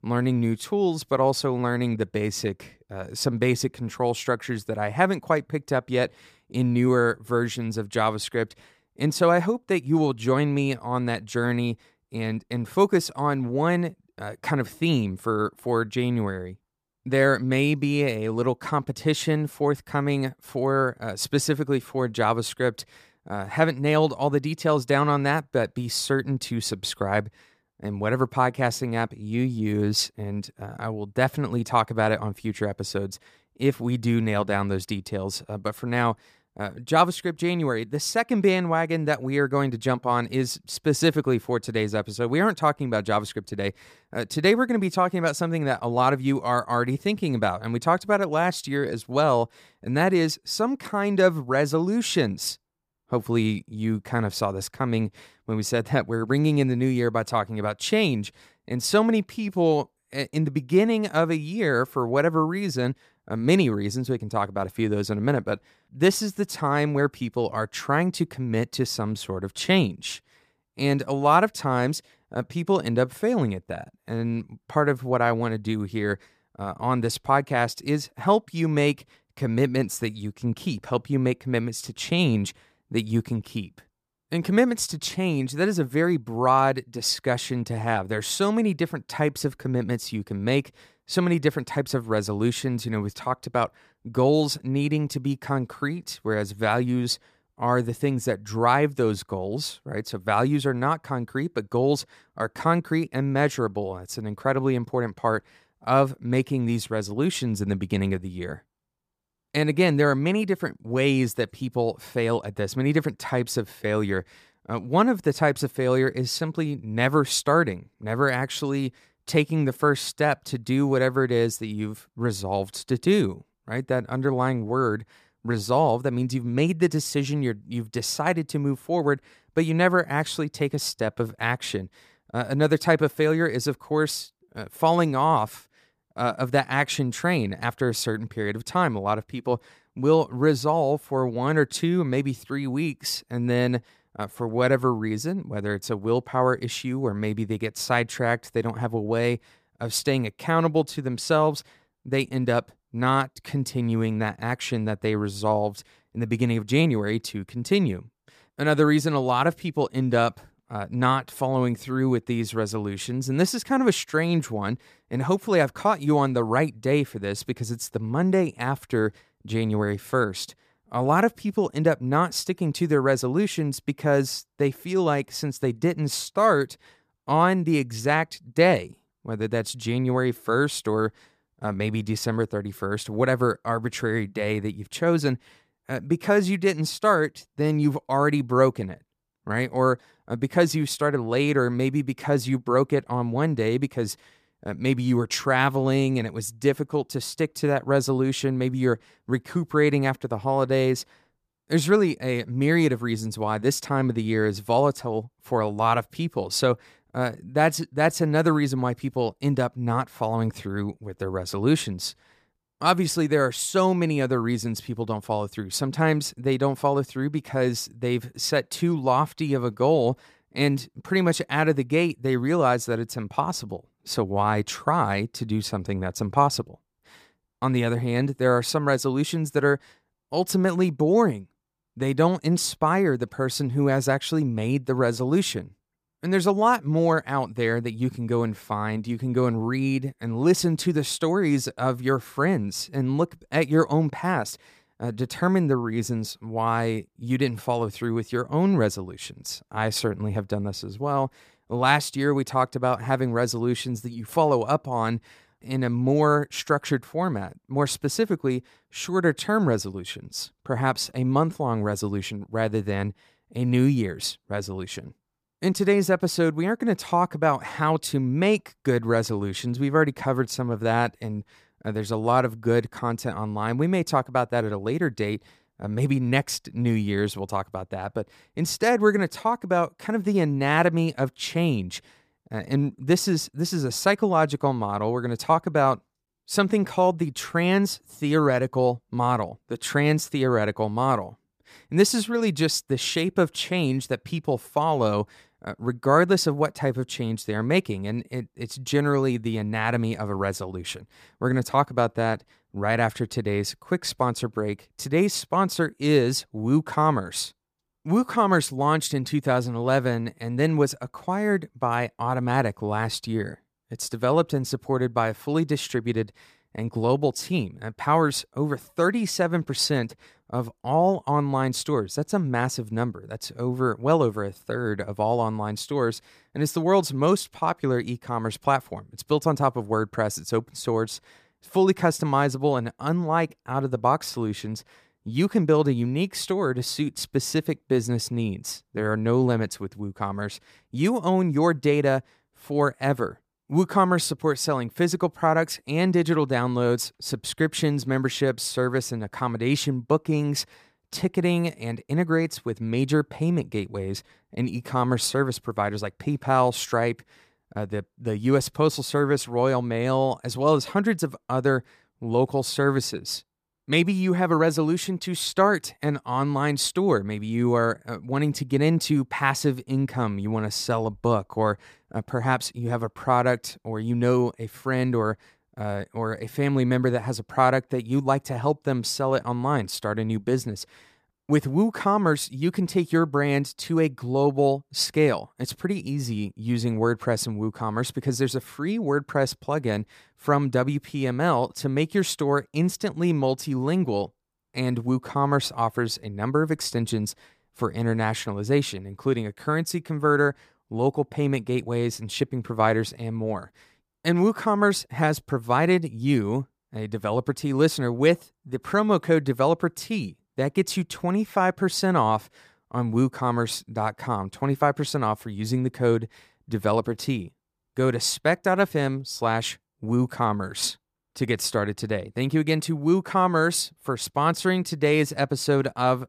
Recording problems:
none

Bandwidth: 14.5 kHz